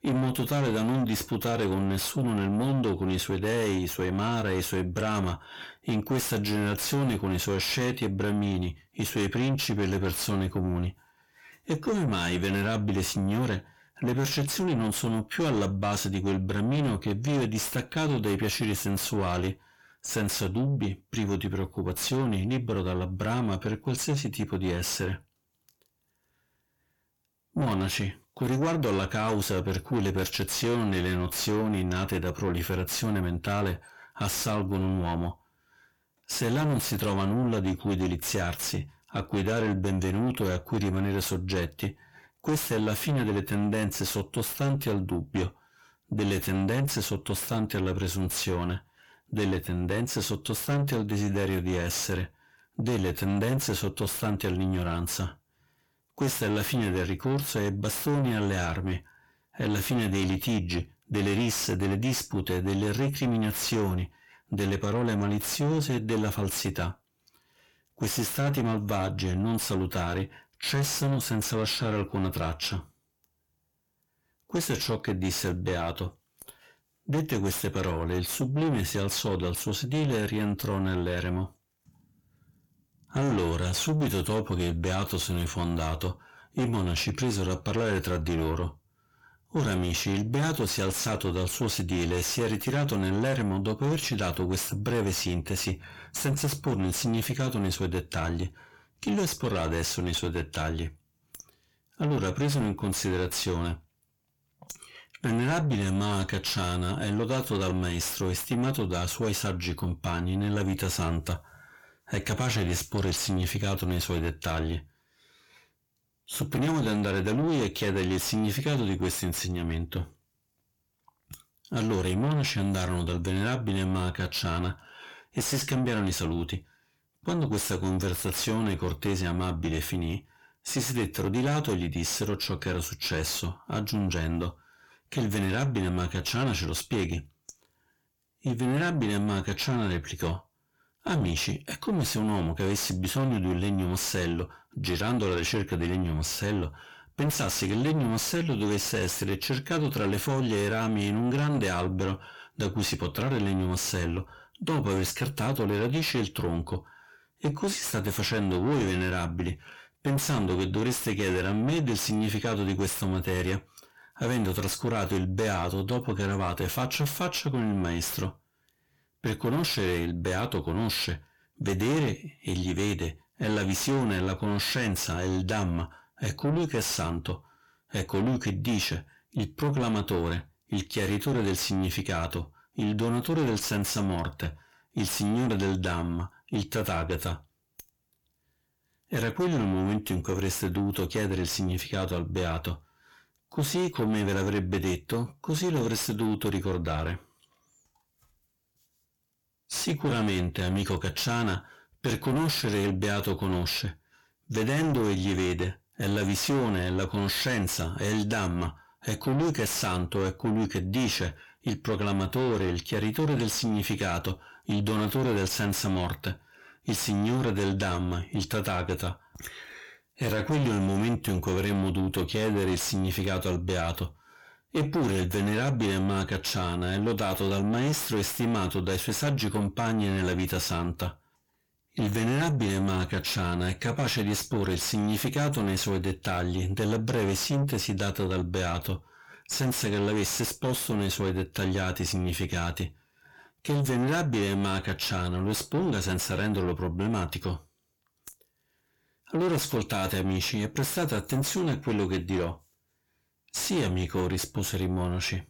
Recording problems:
distortion; heavy; 7 dB below the speech

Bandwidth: 18 kHz